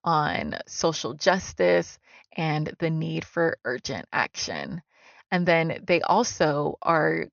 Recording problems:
high frequencies cut off; noticeable; nothing above 6.5 kHz

